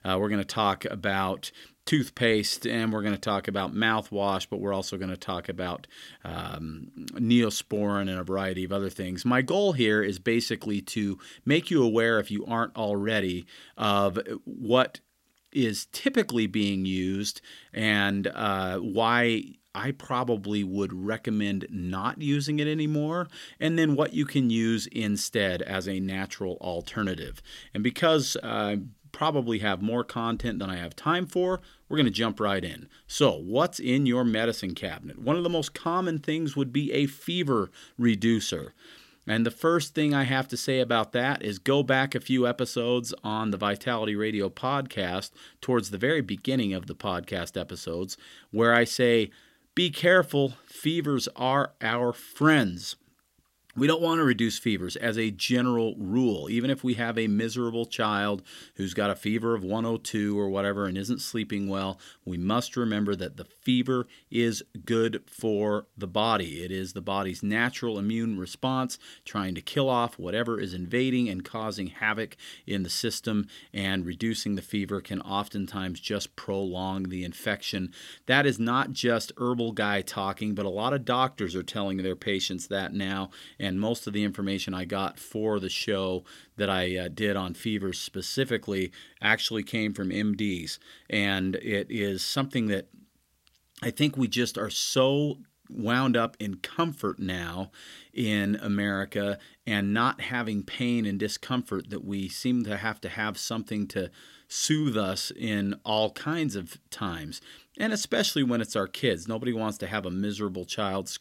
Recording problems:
none

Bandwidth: 16 kHz